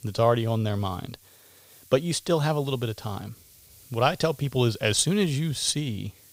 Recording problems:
hiss; faint; throughout; 25 dB below the speech

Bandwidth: 15.5 kHz